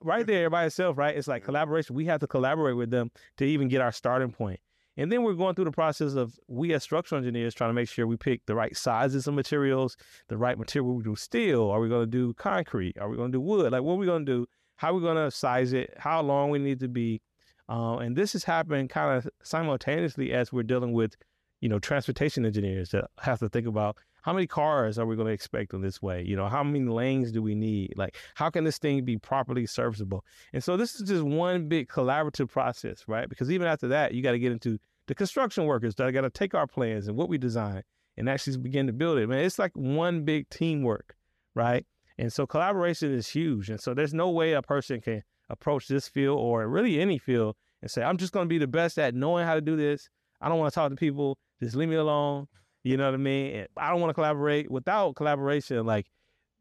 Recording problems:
none

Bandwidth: 13.5 kHz